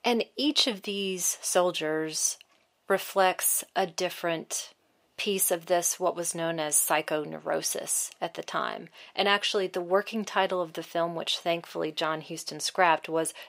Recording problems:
thin; somewhat; fading below 400 Hz

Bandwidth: 15.5 kHz